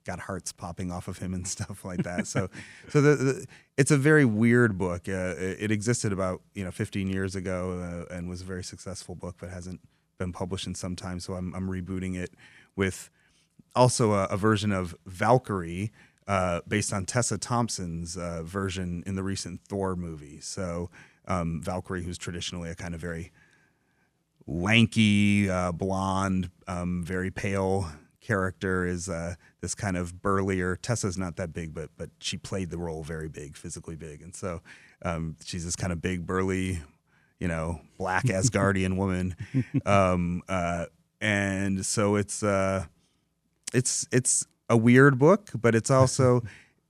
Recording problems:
none

